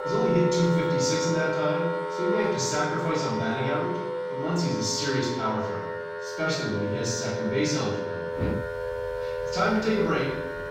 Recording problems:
off-mic speech; far
room echo; noticeable; dies away in 0.8 s
background music; loud; throughout; 3 dB below the speech
animal sounds; noticeable; from 8.5 s on; 10 dB below the speech

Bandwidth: 16.5 kHz